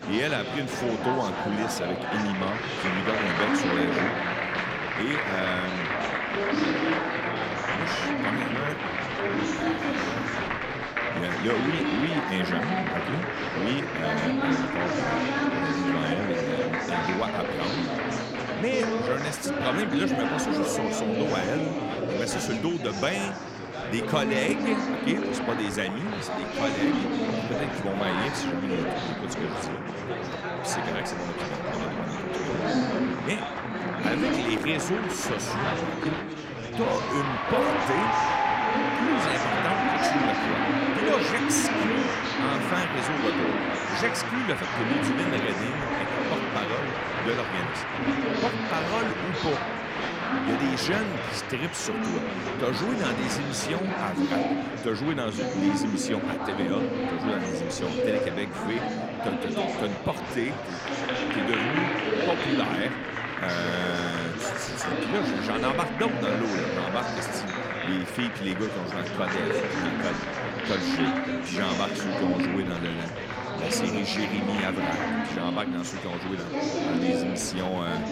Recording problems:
chatter from many people; very loud; throughout; 3 dB above the speech

